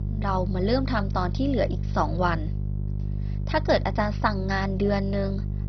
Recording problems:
garbled, watery; badly; nothing above 5.5 kHz
electrical hum; noticeable; throughout; 50 Hz, 15 dB below the speech

